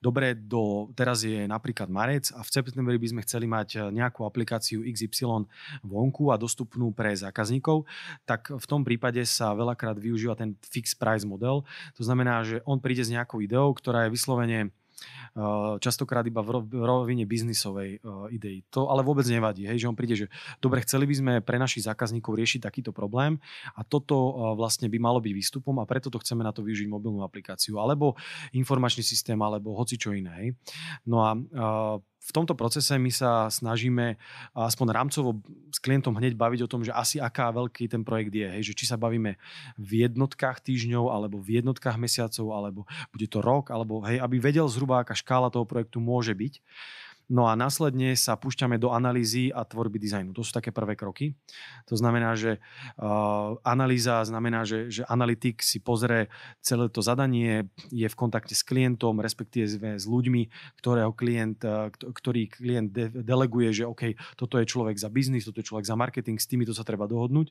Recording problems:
none

